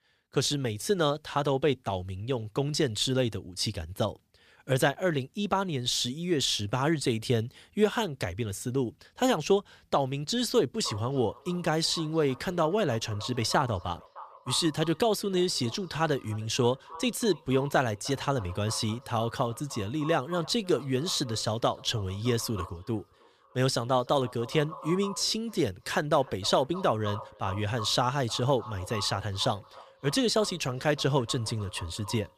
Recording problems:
echo of what is said; noticeable; from 11 s on; 310 ms later, 15 dB below the speech

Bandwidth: 15 kHz